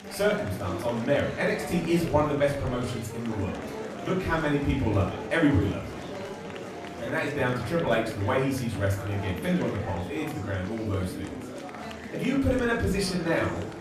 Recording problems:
off-mic speech; far
room echo; slight; dies away in 0.5 s
murmuring crowd; noticeable; throughout; 10 dB below the speech
background music; faint; throughout; 20 dB below the speech

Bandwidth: 14.5 kHz